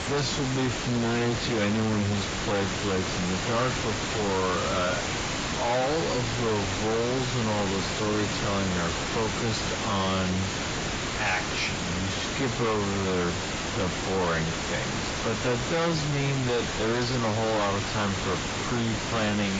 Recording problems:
distortion; heavy; 35% of the sound clipped
garbled, watery; badly; nothing above 7.5 kHz
wrong speed, natural pitch; too slow; 0.6 times normal speed
hiss; loud; throughout; 2 dB below the speech
abrupt cut into speech; at the end

